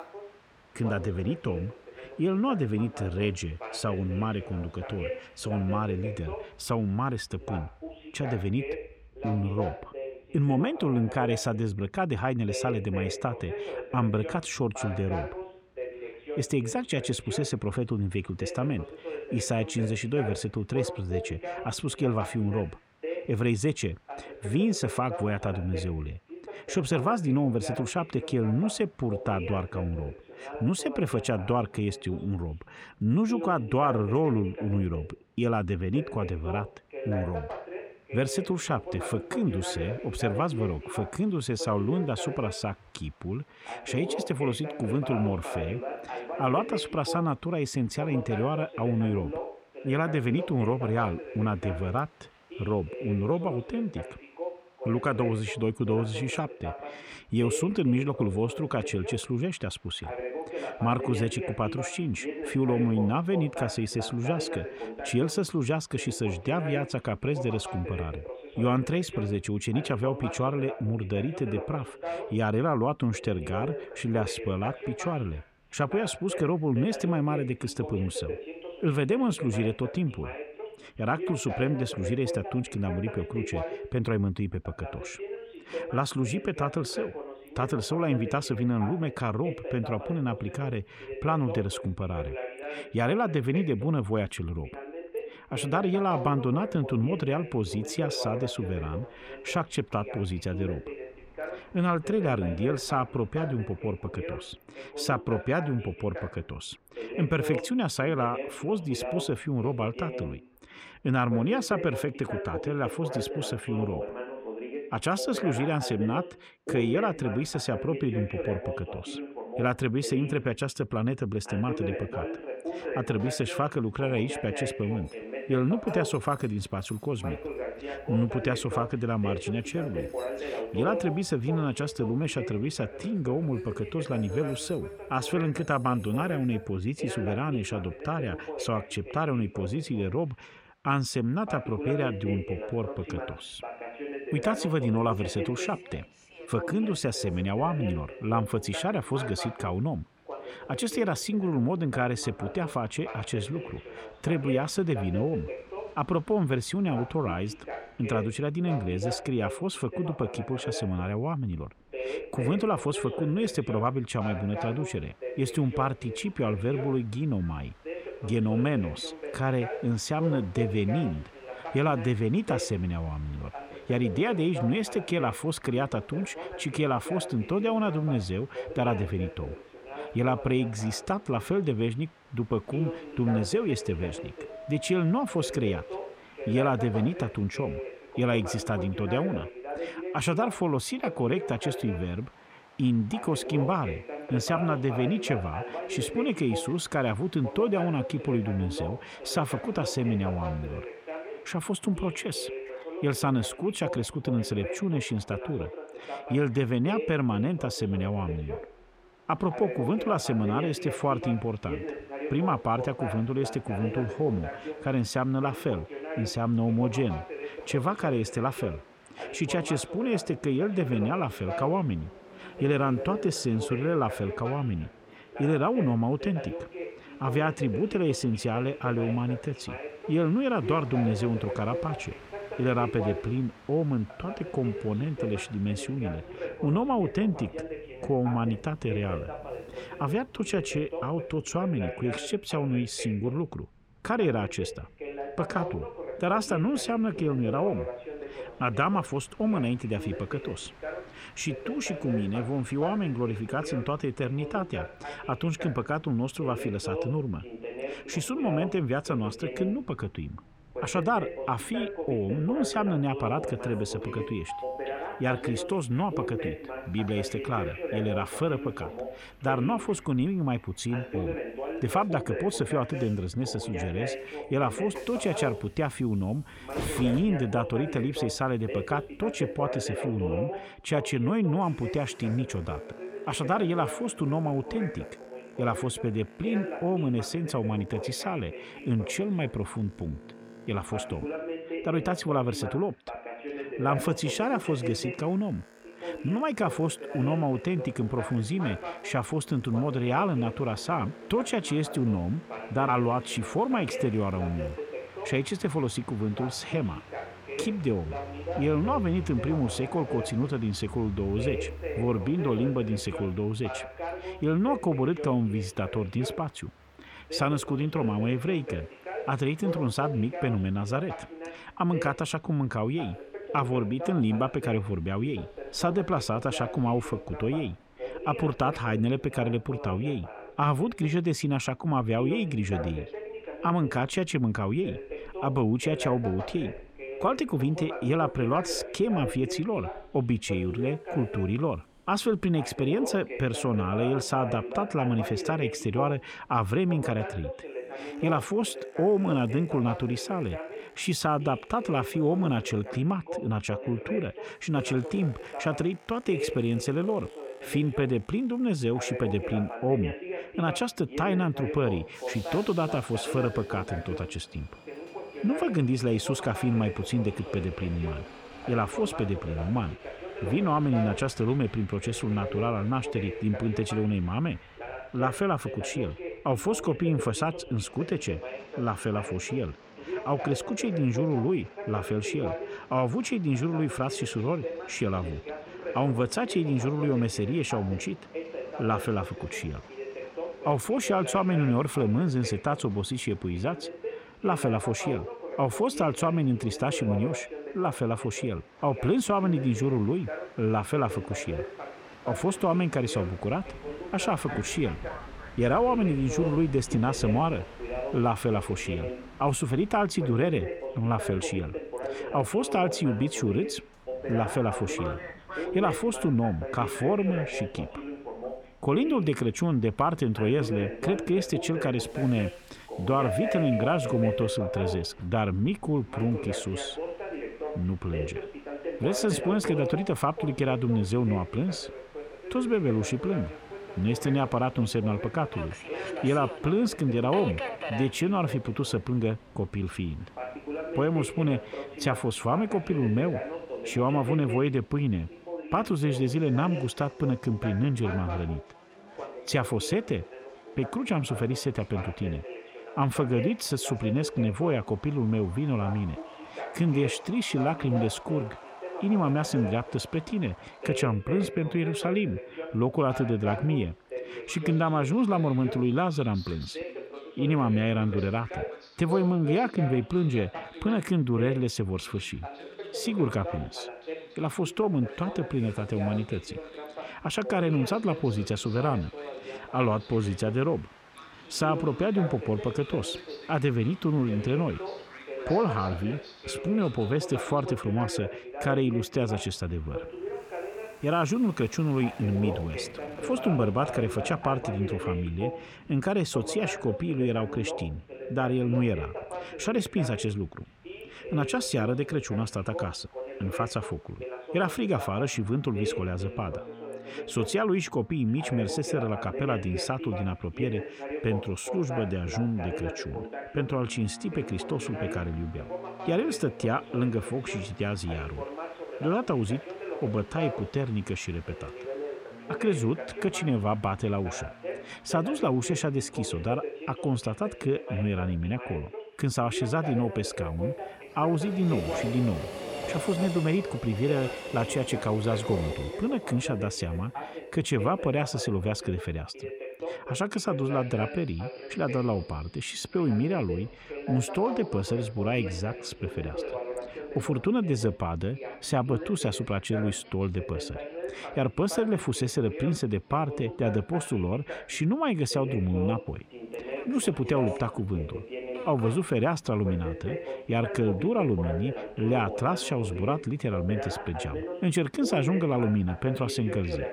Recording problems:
voice in the background; loud; throughout; 9 dB below the speech
train or aircraft noise; noticeable; throughout; 20 dB below the speech

